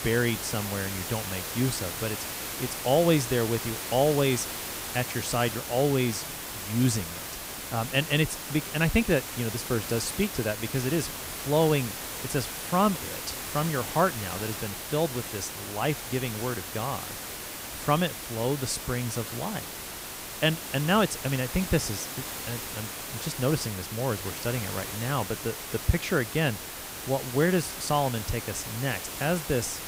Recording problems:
hiss; loud; throughout; 6 dB below the speech

